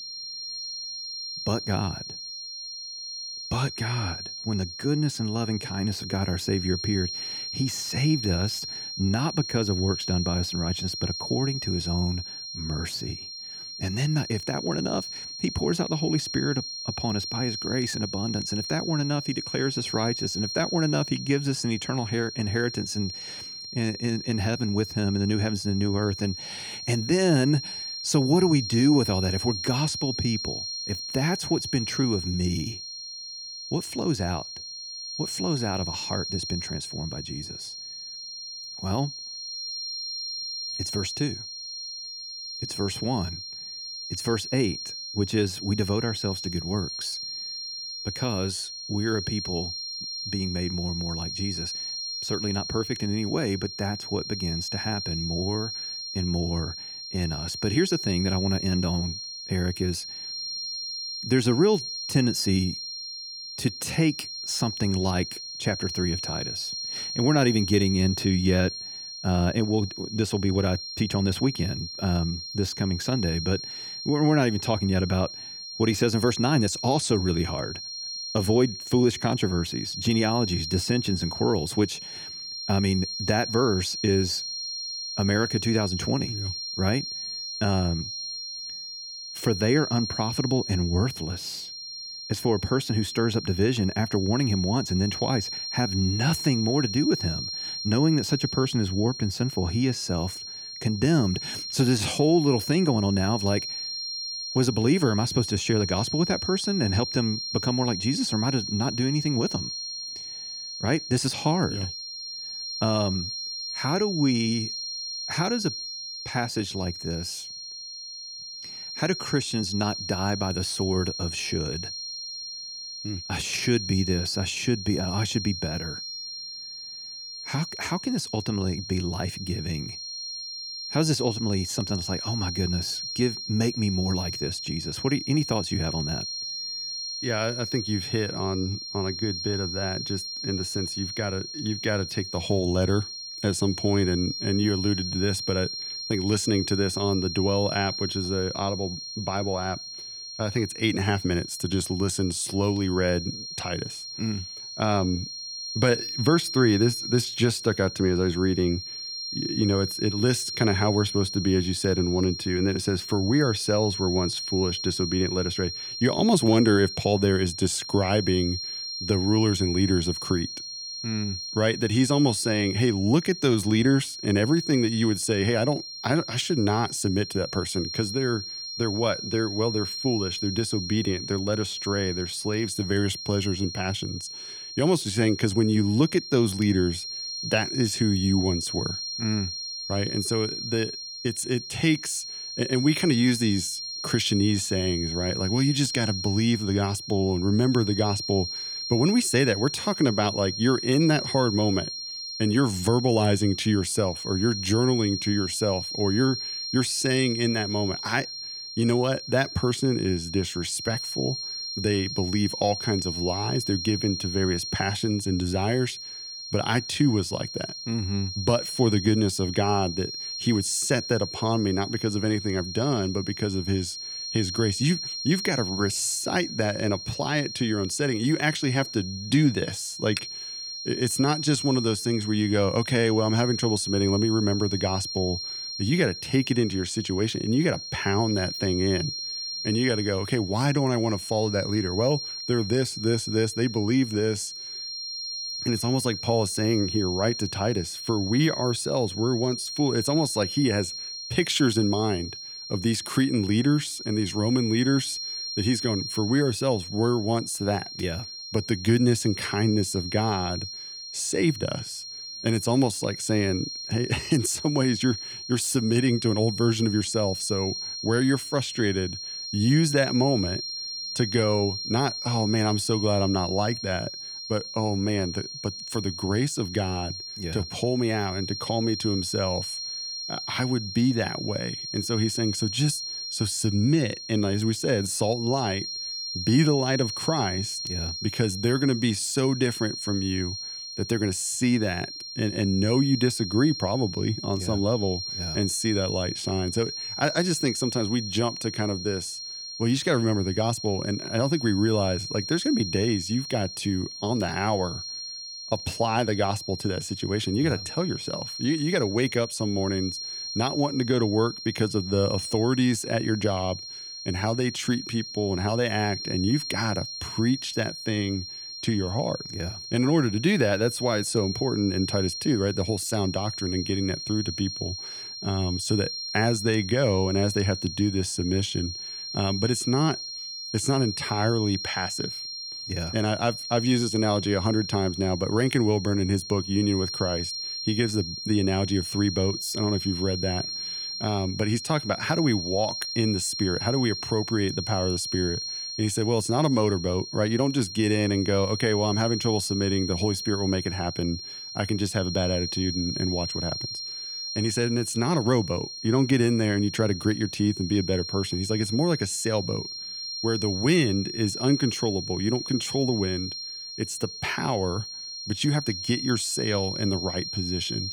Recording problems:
high-pitched whine; loud; throughout; 4 kHz, 6 dB below the speech

